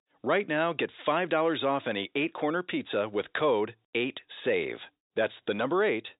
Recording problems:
high frequencies cut off; severe; nothing above 4 kHz
thin; somewhat; fading below 400 Hz

